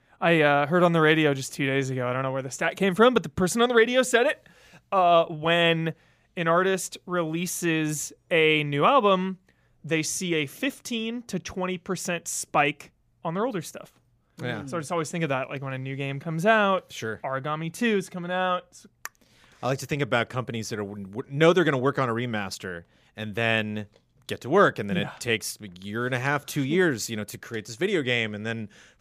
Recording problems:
none

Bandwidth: 15 kHz